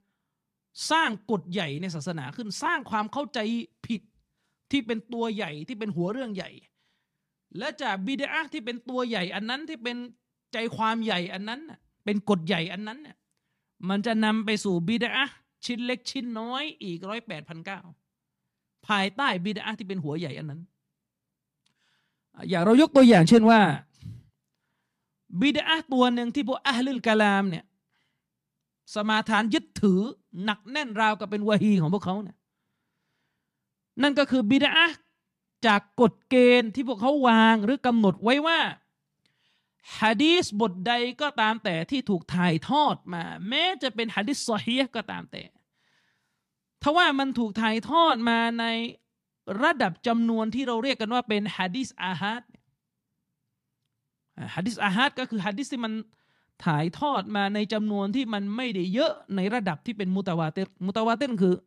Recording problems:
none

